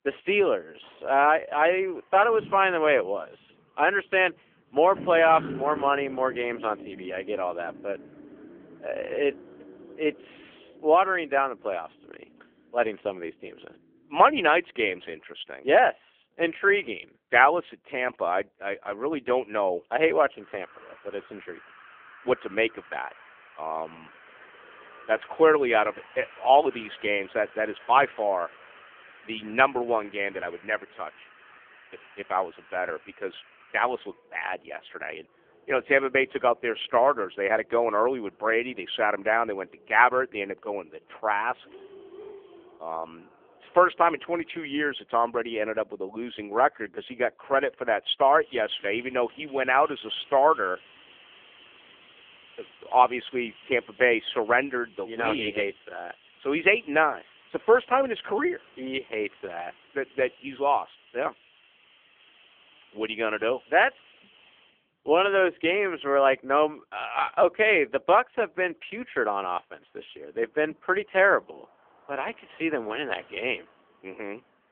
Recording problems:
phone-call audio; poor line; nothing above 3.5 kHz
traffic noise; faint; throughout; 25 dB below the speech

